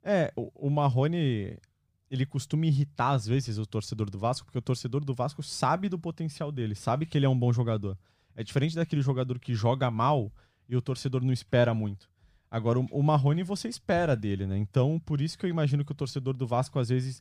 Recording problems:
none

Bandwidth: 15 kHz